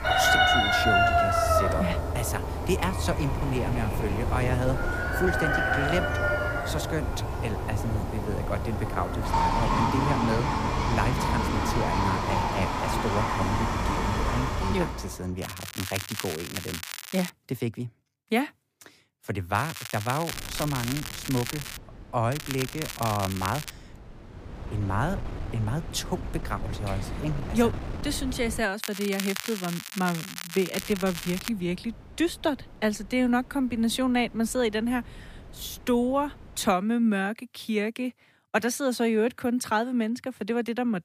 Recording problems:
animal sounds; very loud; until 15 s; 3 dB above the speech
crackling; loud; 4 times, first at 15 s; 6 dB below the speech
wind noise on the microphone; occasional gusts; from 3 to 15 s, from 20 to 29 s and from 31 to 37 s; 15 dB below the speech

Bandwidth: 15 kHz